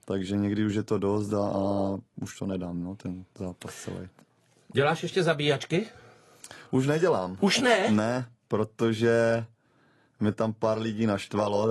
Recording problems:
garbled, watery; slightly; nothing above 11.5 kHz
abrupt cut into speech; at the end

